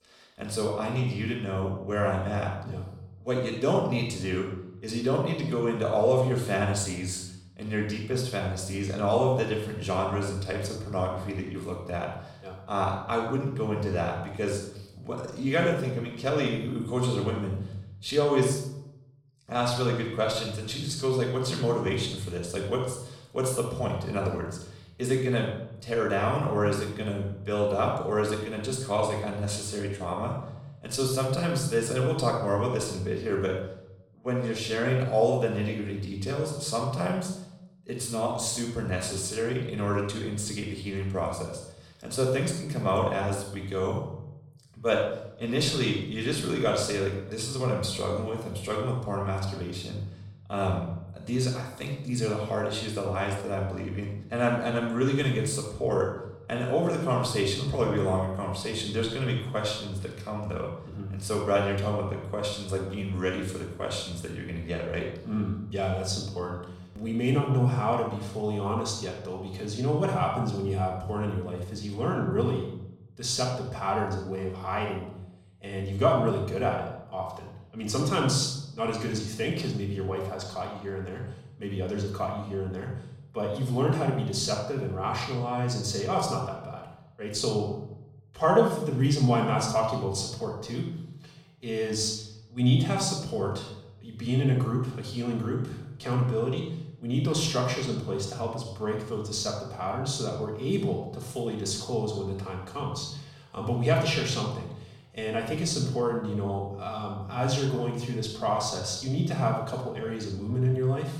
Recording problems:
off-mic speech; far
room echo; noticeable; dies away in 0.7 s

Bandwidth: 17.5 kHz